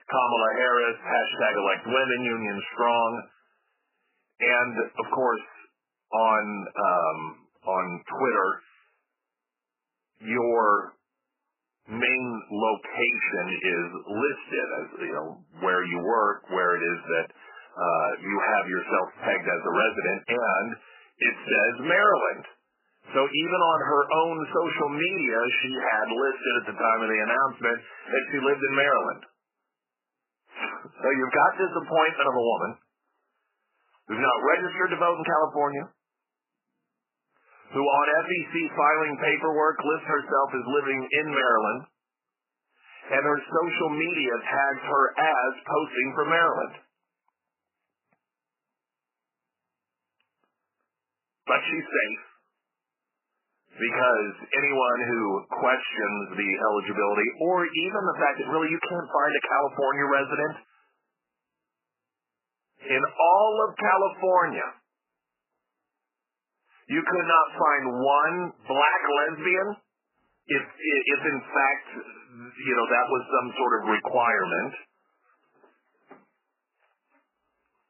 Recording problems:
garbled, watery; badly; nothing above 3 kHz
thin; somewhat; fading below 350 Hz

